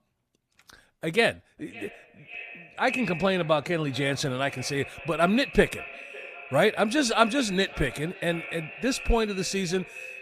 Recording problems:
echo of what is said; noticeable; throughout; 550 ms later, 15 dB below the speech

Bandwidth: 14.5 kHz